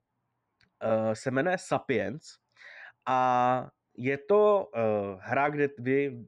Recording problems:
muffled; very; fading above 3.5 kHz

